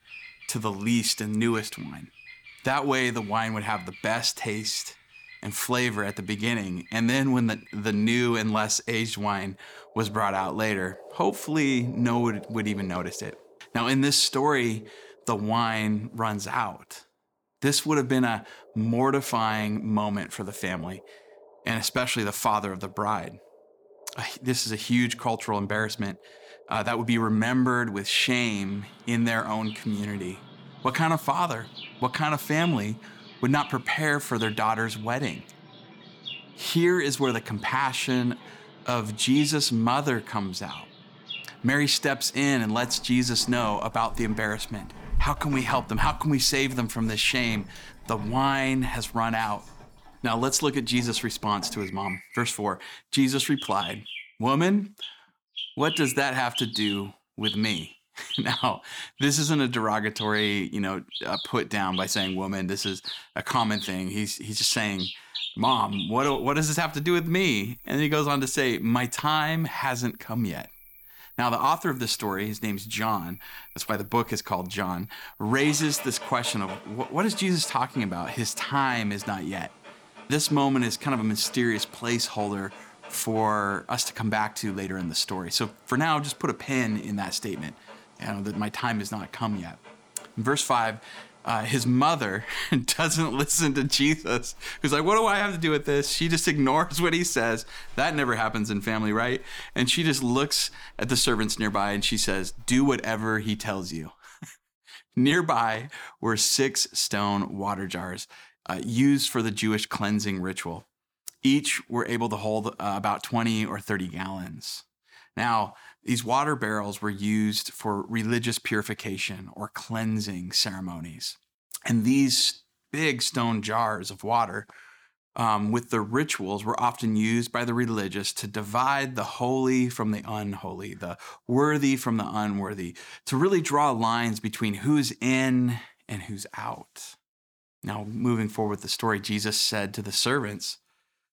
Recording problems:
animal sounds; noticeable; until 1:44; 15 dB below the speech

